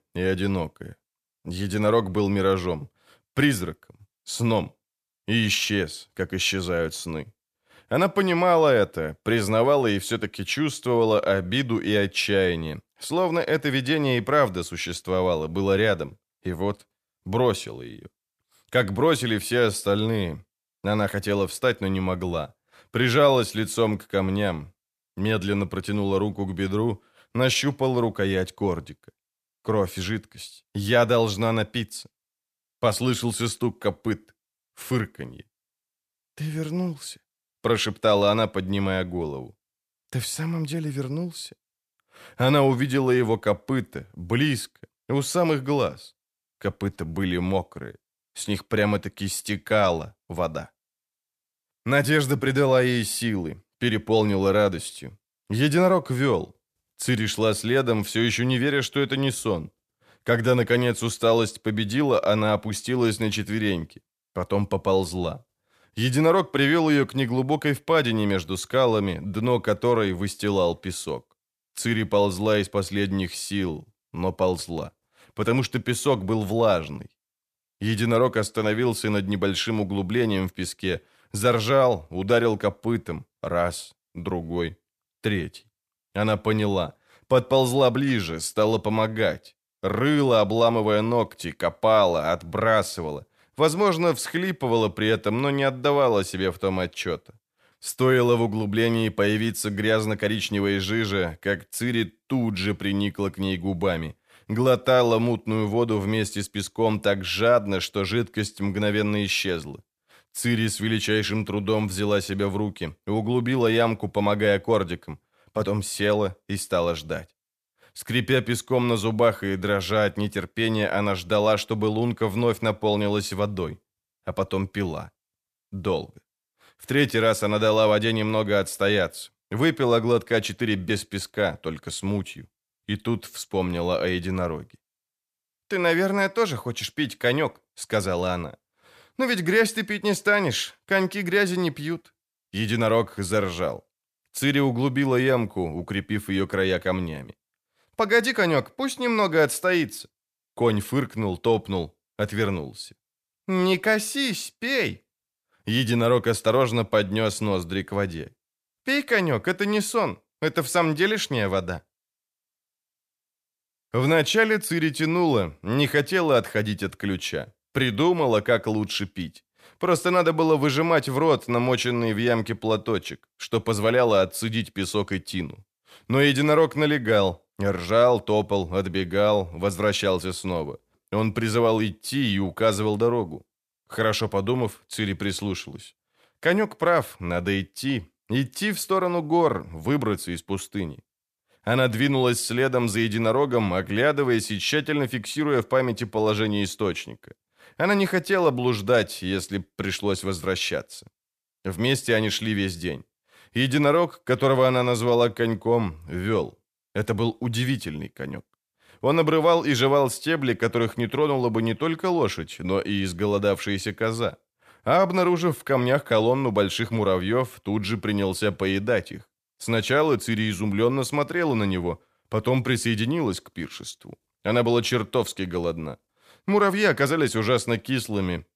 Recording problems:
none

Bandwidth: 14.5 kHz